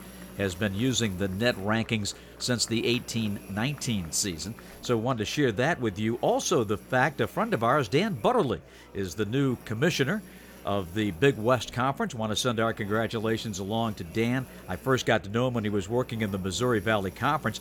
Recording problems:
electrical hum; faint; throughout; 60 Hz, 25 dB below the speech
murmuring crowd; faint; throughout; 25 dB below the speech

